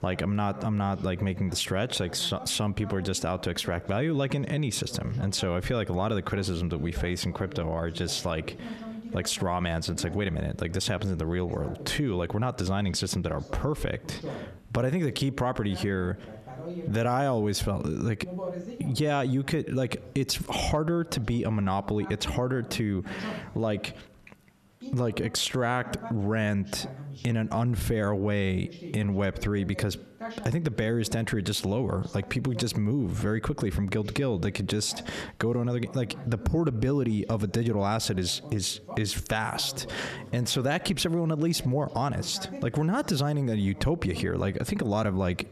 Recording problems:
squashed, flat; heavily, background pumping
voice in the background; noticeable; throughout; 15 dB below the speech

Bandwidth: 13.5 kHz